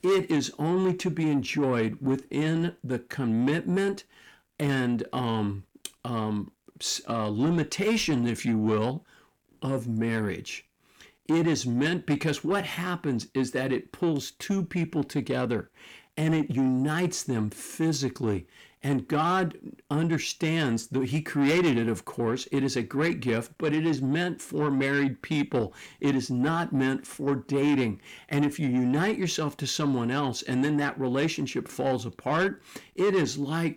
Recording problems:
distortion; slight; 10 dB below the speech

